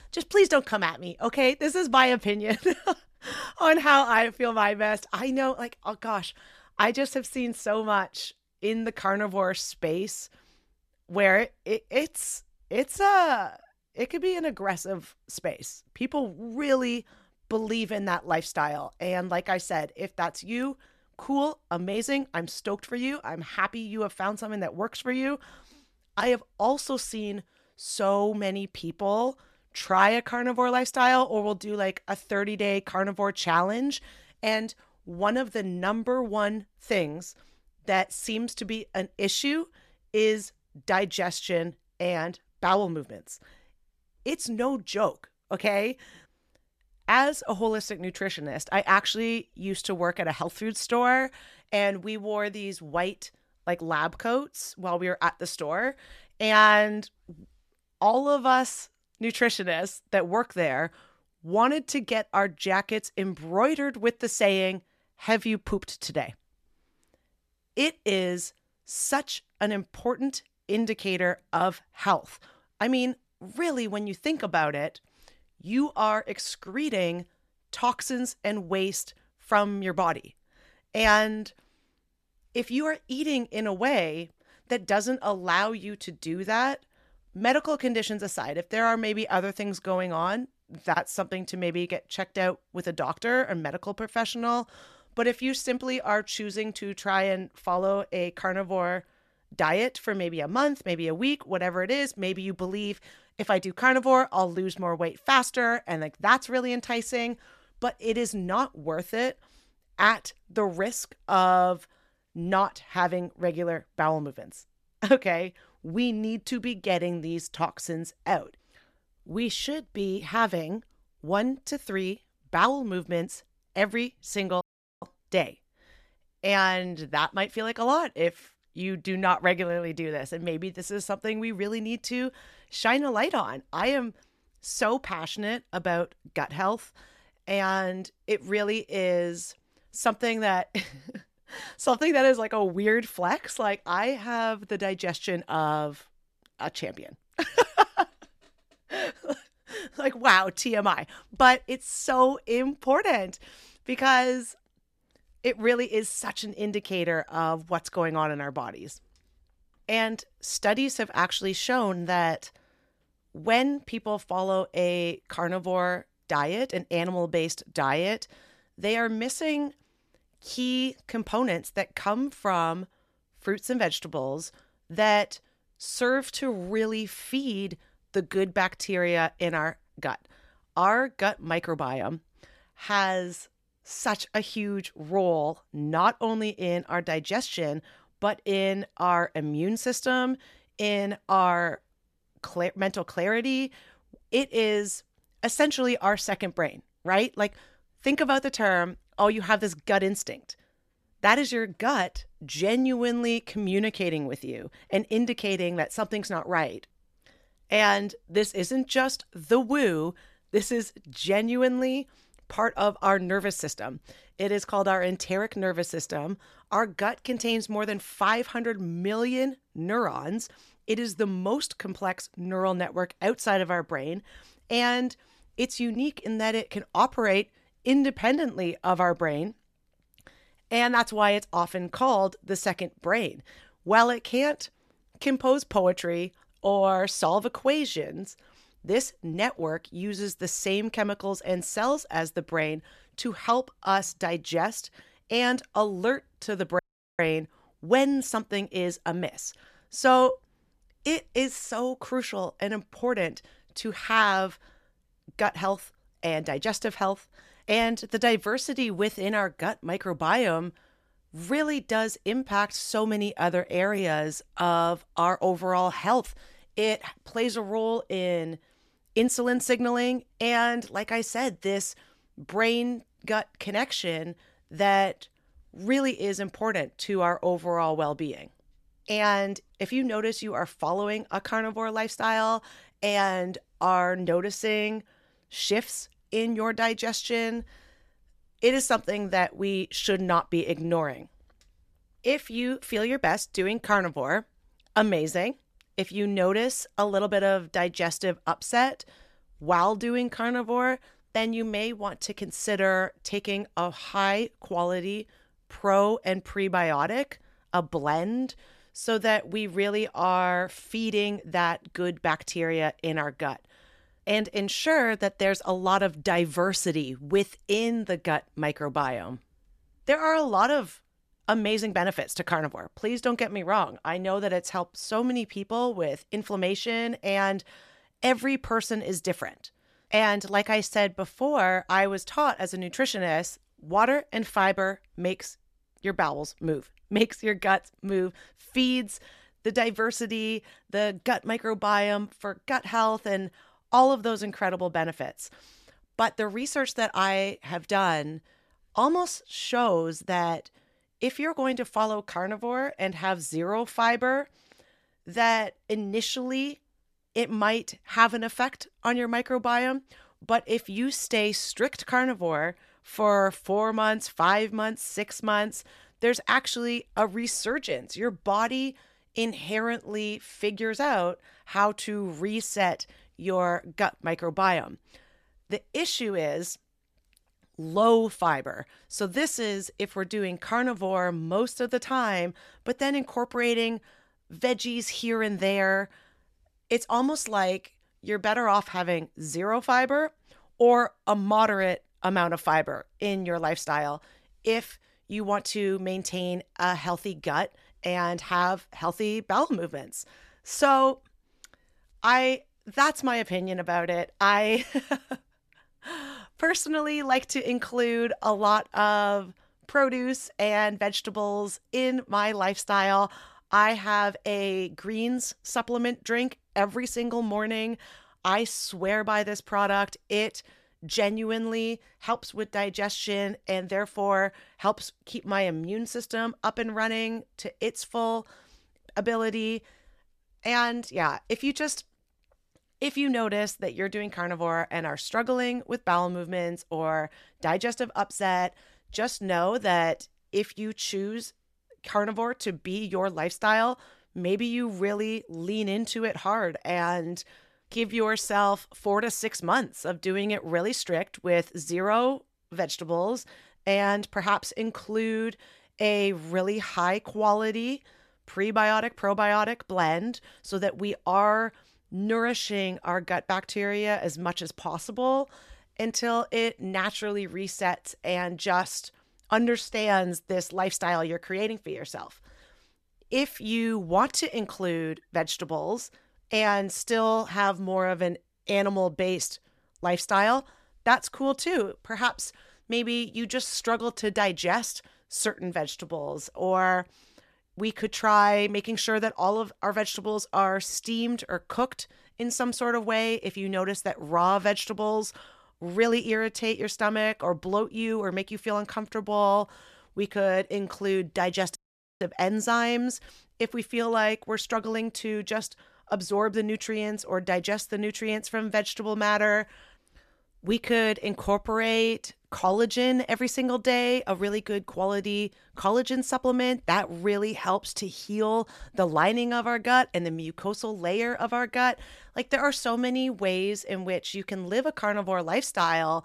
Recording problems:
audio cutting out; at 2:05, at 4:07 and at 8:22

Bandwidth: 14 kHz